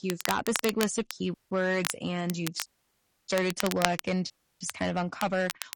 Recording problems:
distortion; slight; 4% of the sound clipped
garbled, watery; slightly; nothing above 10.5 kHz
crackle, like an old record; loud; 6 dB below the speech
audio cutting out; at 1.5 s, at 2.5 s for 0.5 s and at 4.5 s

